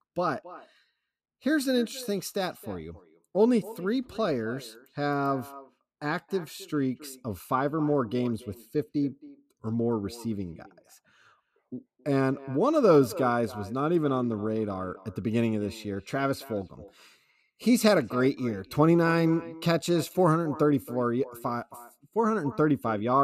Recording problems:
echo of what is said; faint; throughout; 270 ms later, 20 dB below the speech
abrupt cut into speech; at the end

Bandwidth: 14.5 kHz